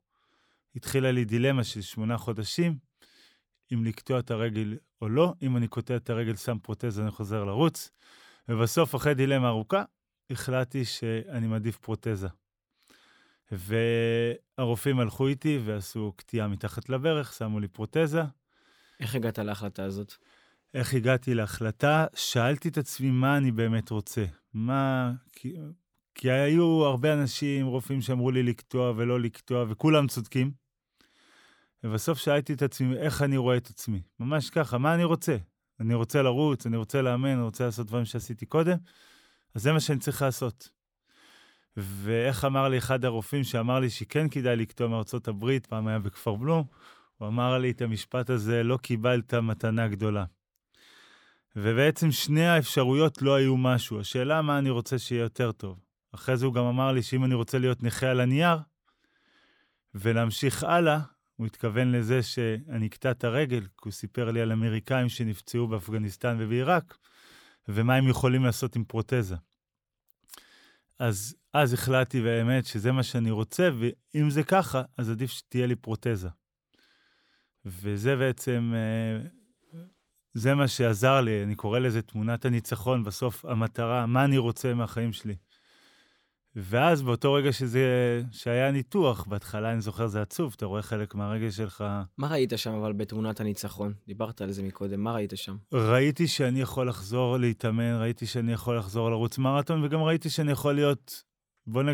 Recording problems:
abrupt cut into speech; at the end

